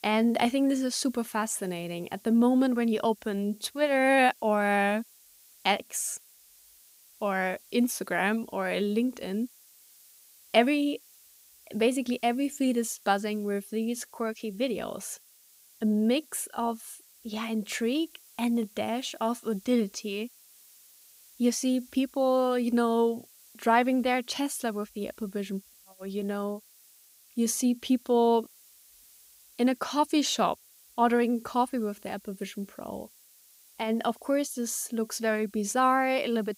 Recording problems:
hiss; faint; throughout; 25 dB below the speech

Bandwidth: 15.5 kHz